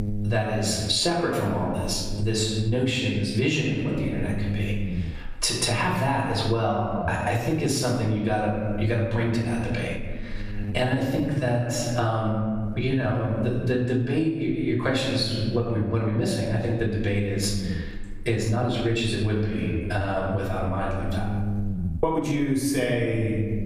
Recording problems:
off-mic speech; far
room echo; noticeable; dies away in 1.1 s
squashed, flat; somewhat
electrical hum; noticeable; throughout; 60 Hz, 15 dB below the speech
uneven, jittery; strongly; from 7 to 22 s

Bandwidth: 14.5 kHz